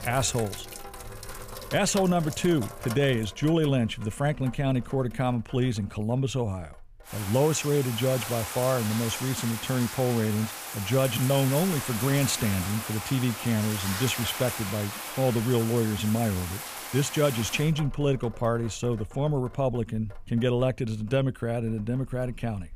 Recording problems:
household noises; loud; throughout; 8 dB below the speech

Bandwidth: 15 kHz